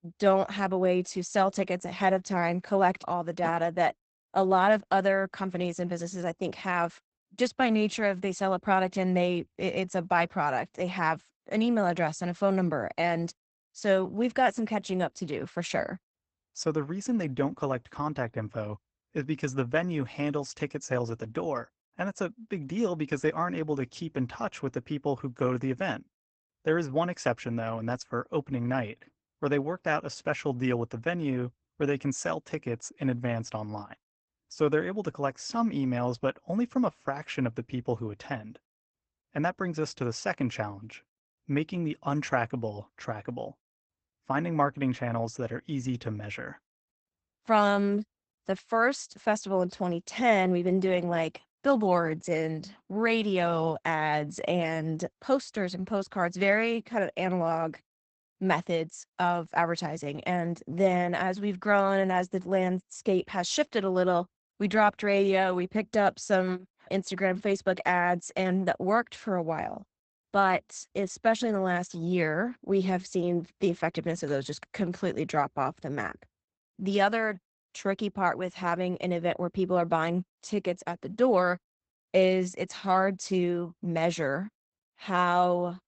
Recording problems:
garbled, watery; badly; nothing above 8 kHz

